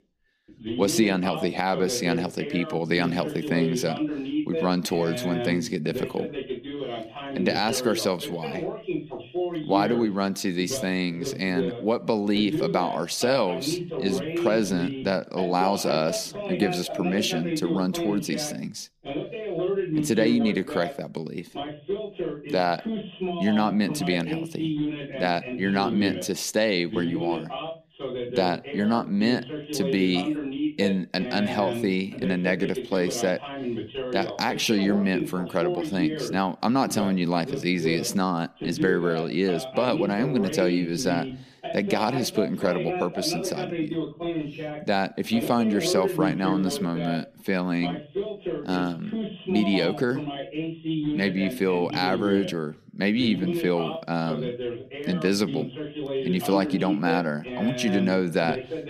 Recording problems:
voice in the background; loud; throughout; 6 dB below the speech

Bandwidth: 15 kHz